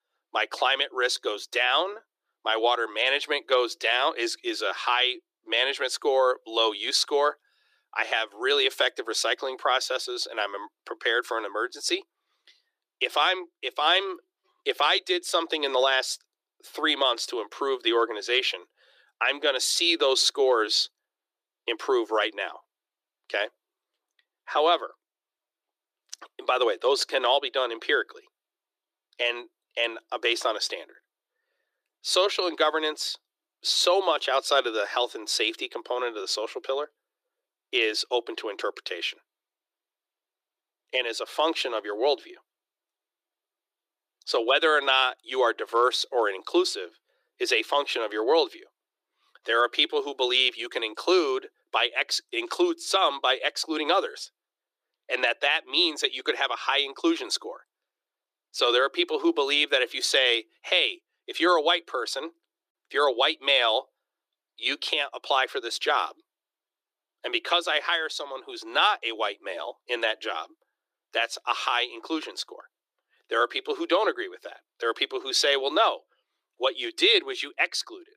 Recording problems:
thin; very; fading below 350 Hz

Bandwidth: 15 kHz